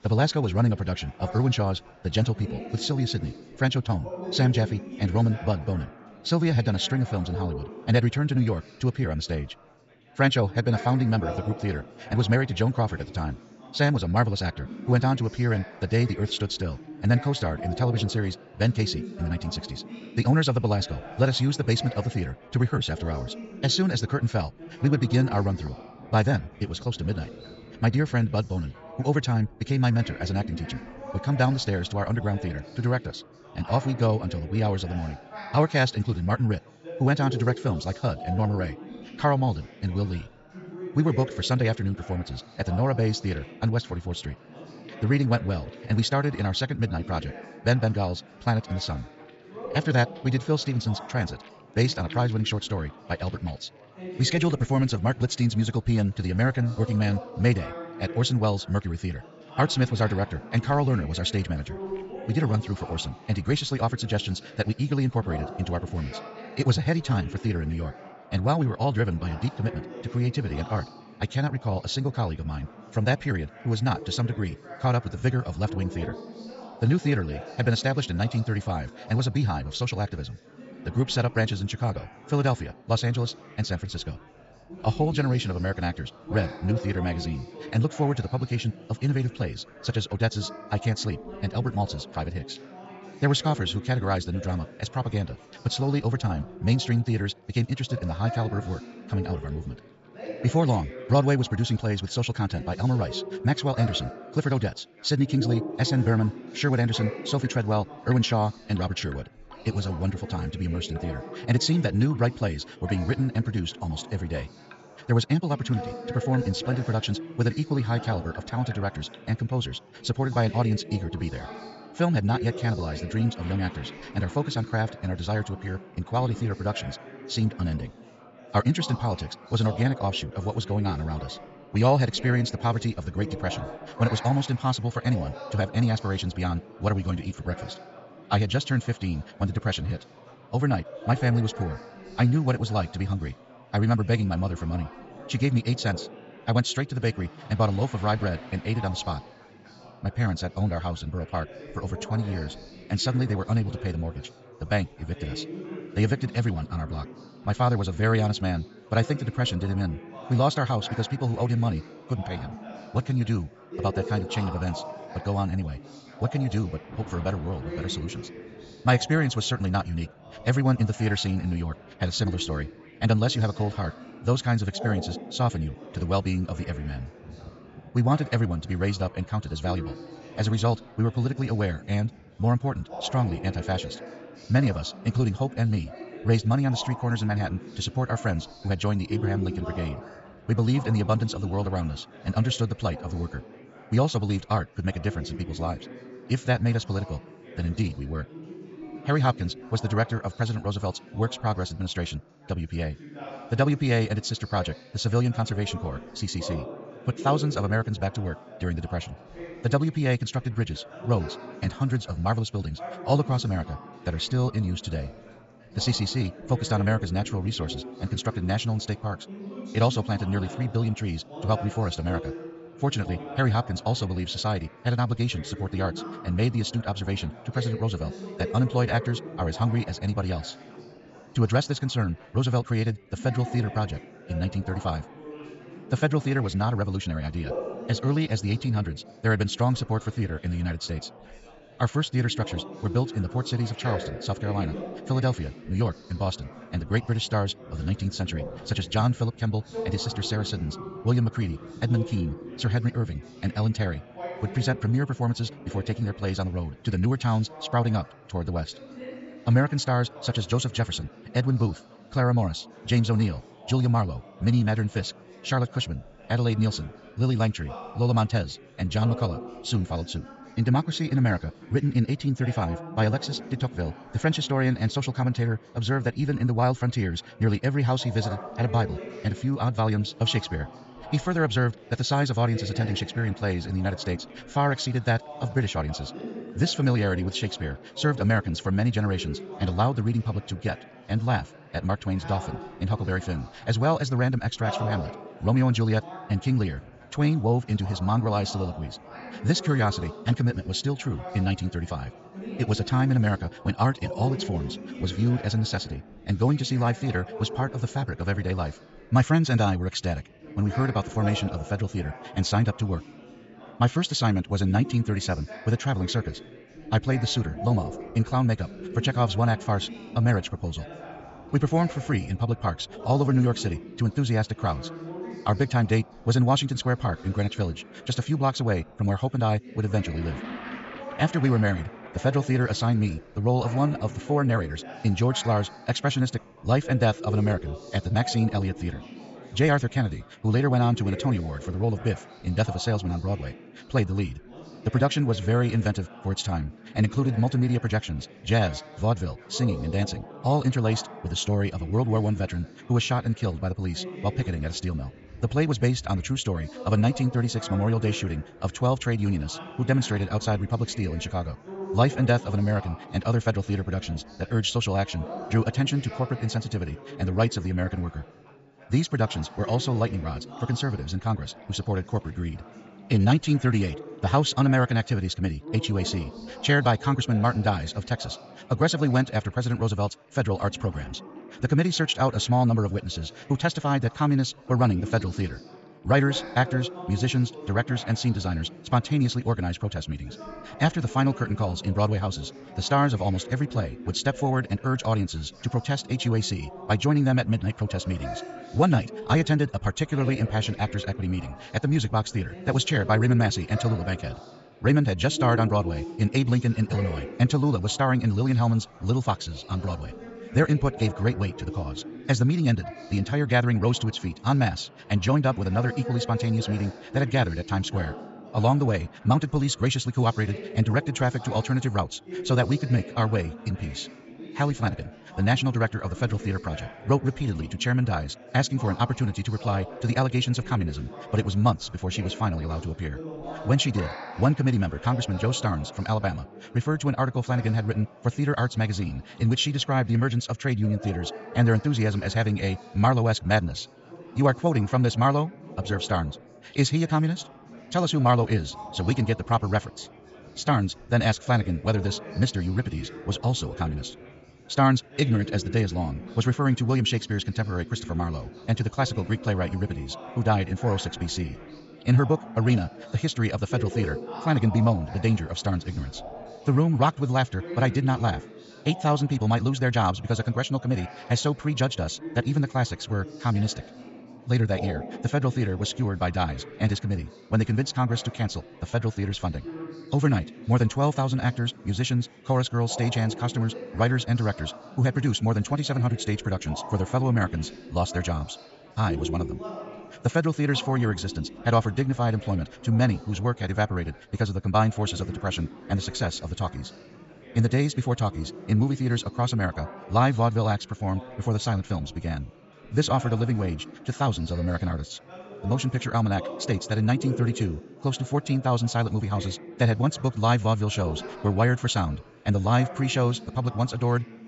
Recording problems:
wrong speed, natural pitch; too fast; 1.6 times normal speed
high frequencies cut off; noticeable; nothing above 8 kHz
chatter from many people; noticeable; throughout; 15 dB below the speech
rain or running water; faint; throughout; 30 dB below the speech

